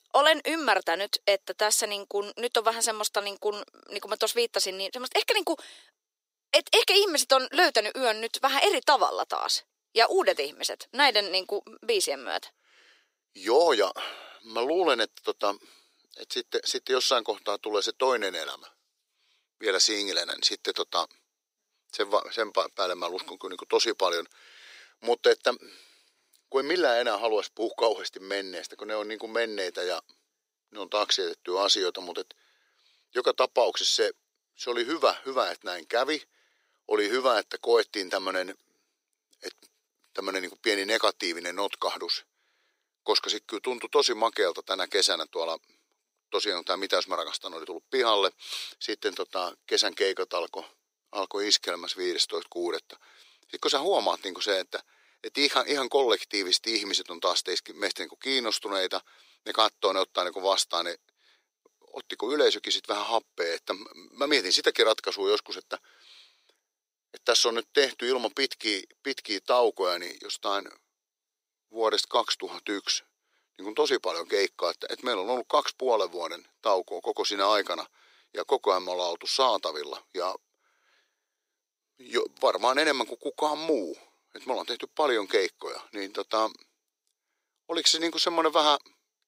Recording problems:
thin; somewhat; fading below 400 Hz

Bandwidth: 15.5 kHz